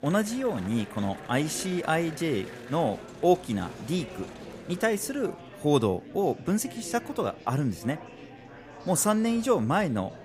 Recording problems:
murmuring crowd; noticeable; throughout; 15 dB below the speech

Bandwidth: 15 kHz